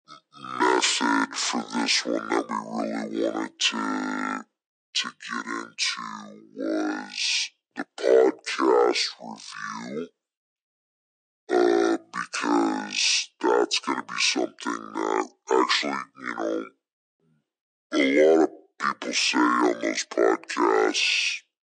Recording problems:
wrong speed and pitch; too slow and too low; 0.6 times normal speed
thin; somewhat; fading below 300 Hz

